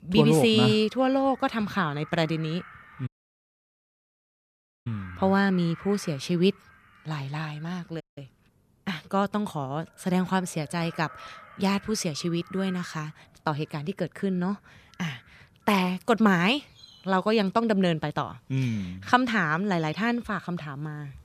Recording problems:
animal sounds; faint; throughout; 25 dB below the speech
audio cutting out; at 3 s for 2 s and at 8 s

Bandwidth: 14.5 kHz